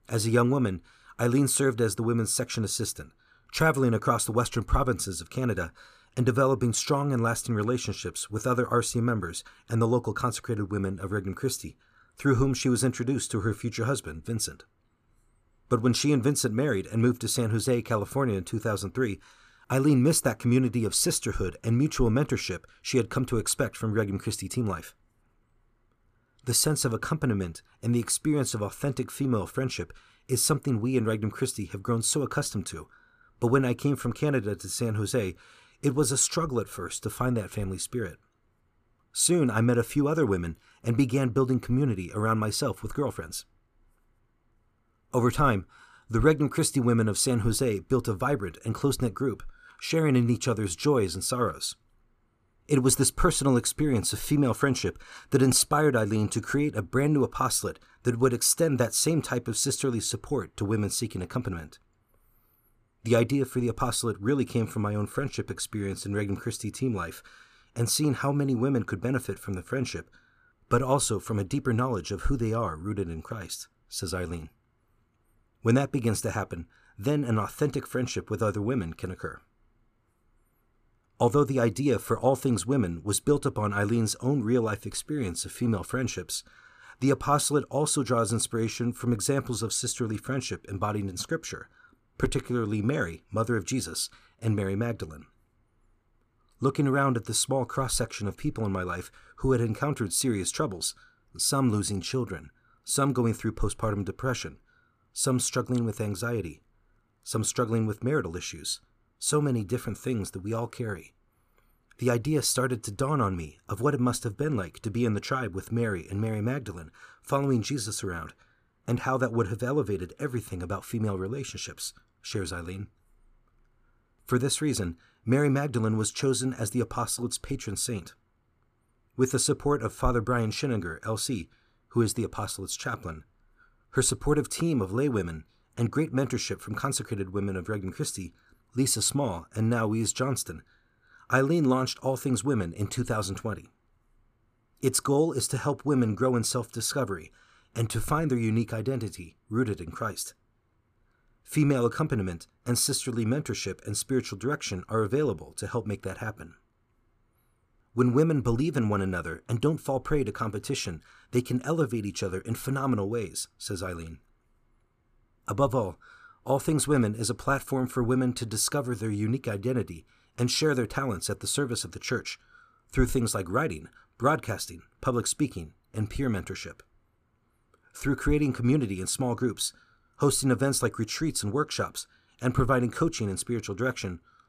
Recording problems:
none

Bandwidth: 14.5 kHz